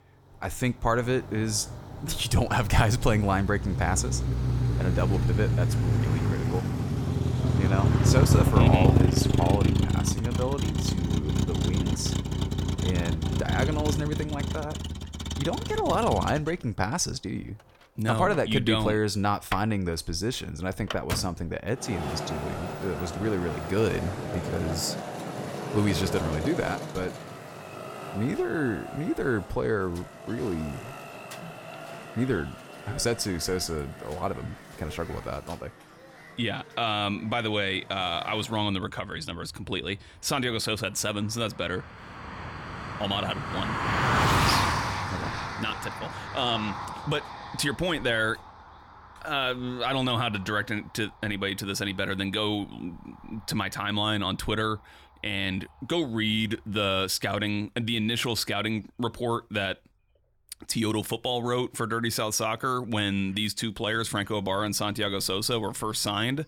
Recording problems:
traffic noise; very loud; throughout; as loud as the speech

